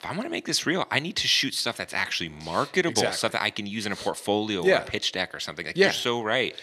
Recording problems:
thin; somewhat; fading below 600 Hz

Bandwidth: 13.5 kHz